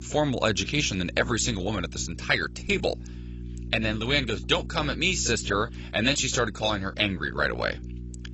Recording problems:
garbled, watery; badly; nothing above 8 kHz
electrical hum; faint; throughout; 60 Hz, 25 dB below the speech

